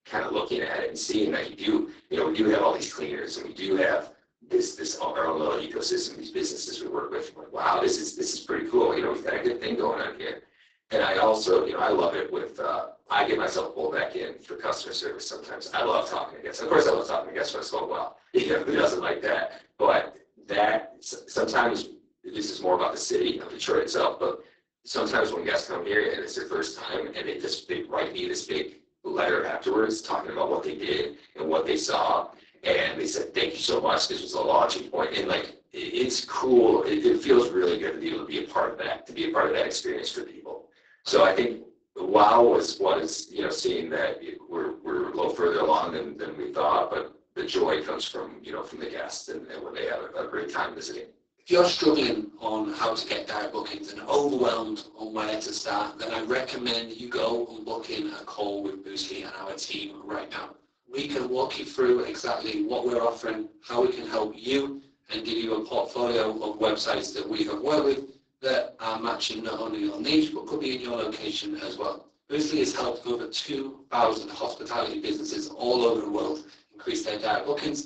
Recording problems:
off-mic speech; far
garbled, watery; badly; nothing above 8 kHz
thin; very; fading below 300 Hz
room echo; slight; dies away in 0.3 s

